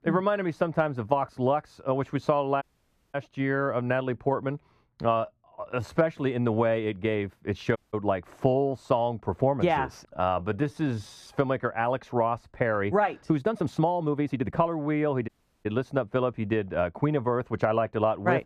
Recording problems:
muffled; slightly; fading above 2.5 kHz
audio cutting out; at 2.5 s for 0.5 s, at 8 s and at 15 s
uneven, jittery; strongly; from 5 to 15 s

